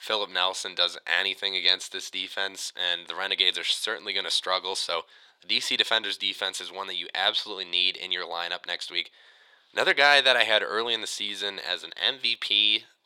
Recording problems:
thin; very; fading below 750 Hz

